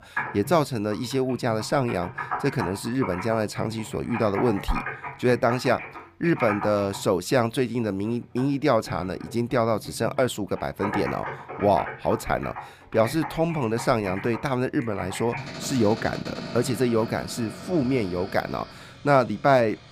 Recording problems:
household noises; noticeable; throughout; 10 dB below the speech

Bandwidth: 15 kHz